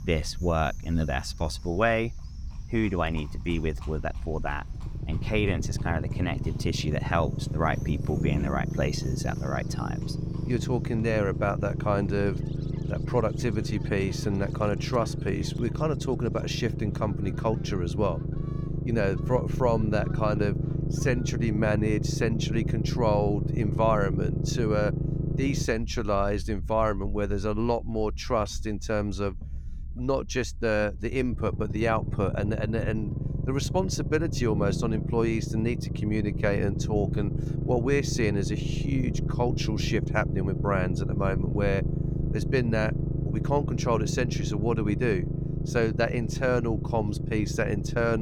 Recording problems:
low rumble; loud; throughout; 10 dB below the speech
animal sounds; faint; until 21 s; 25 dB below the speech
abrupt cut into speech; at the end

